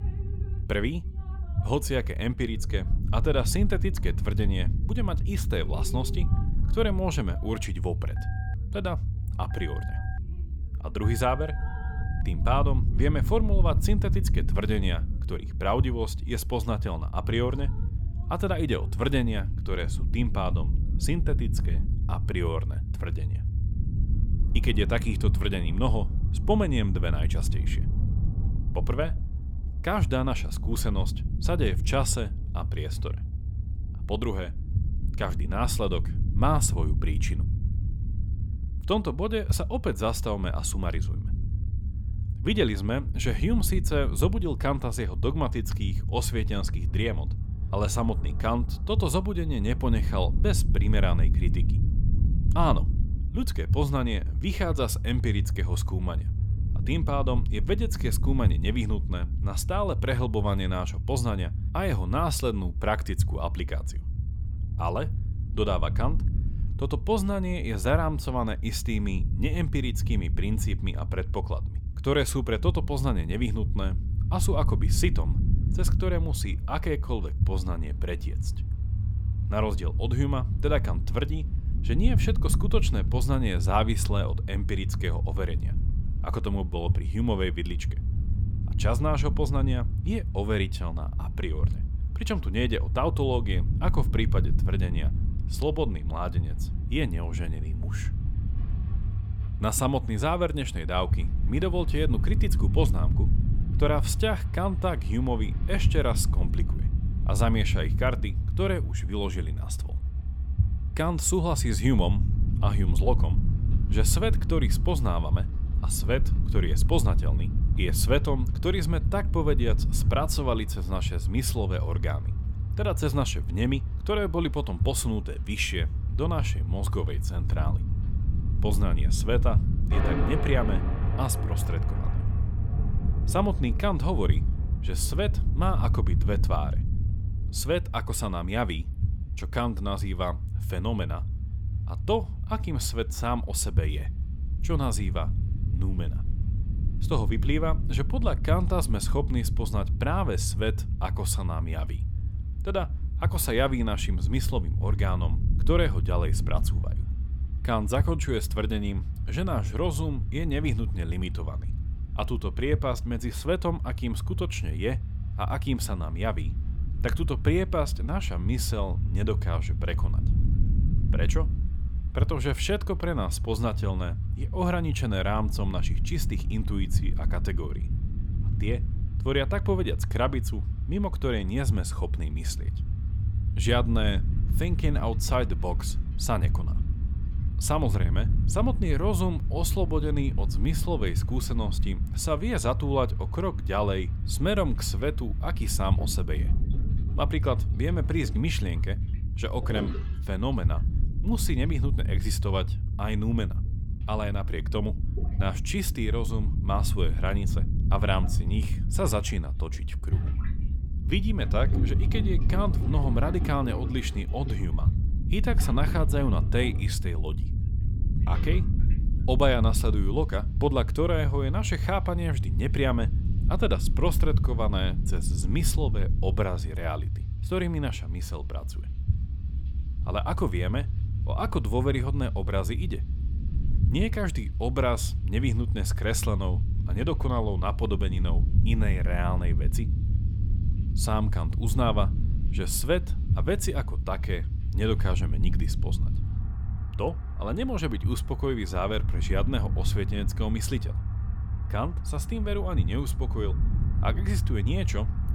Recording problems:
rain or running water; noticeable; throughout; 20 dB below the speech
low rumble; noticeable; throughout; 15 dB below the speech
phone ringing; faint; from 8 to 12 s; peak 15 dB below the speech

